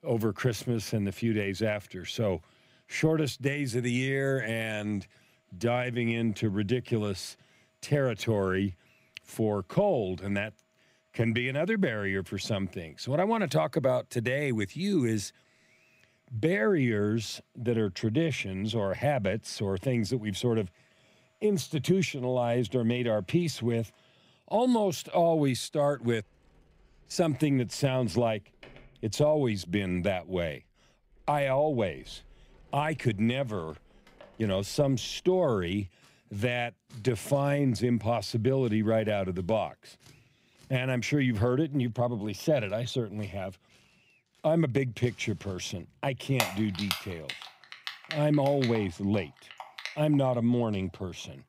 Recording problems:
household noises; noticeable; throughout; 10 dB below the speech

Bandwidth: 15.5 kHz